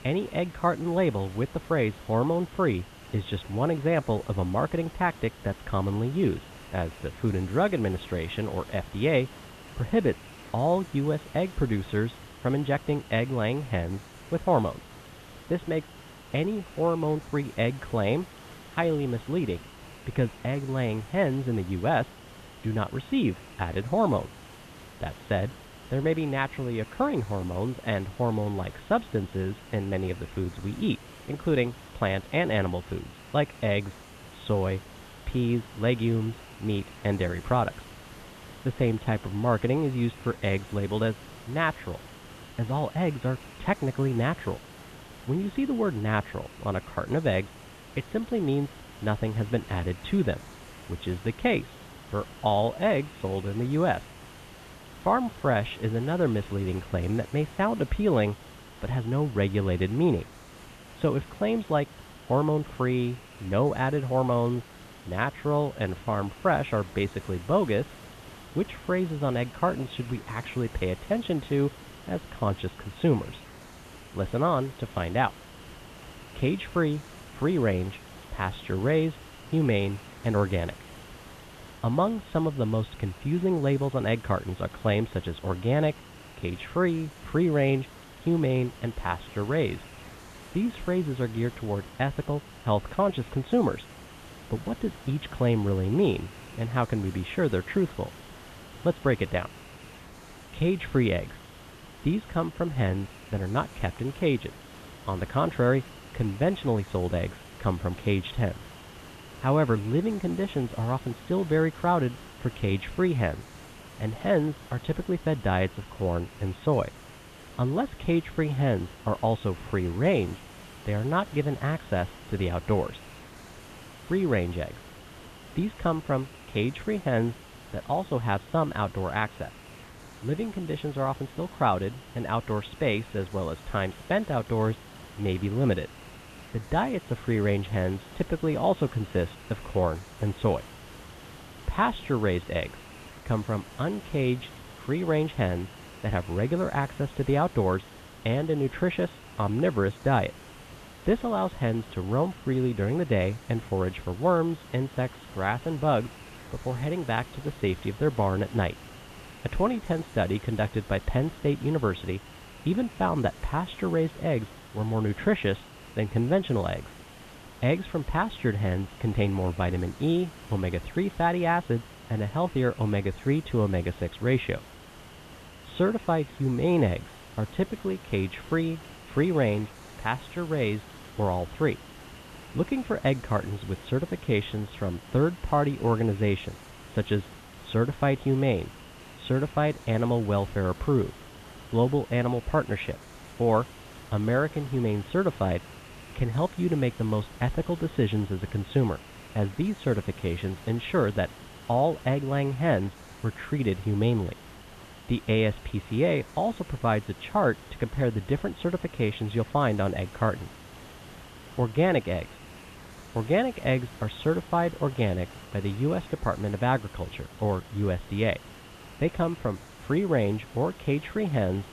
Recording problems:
high frequencies cut off; severe; nothing above 4 kHz
hiss; noticeable; throughout; 20 dB below the speech

